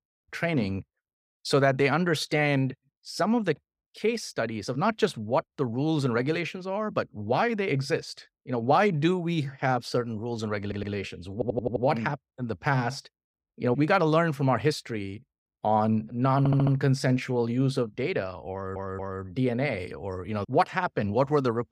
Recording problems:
audio stuttering; 4 times, first at 11 s

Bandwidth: 15.5 kHz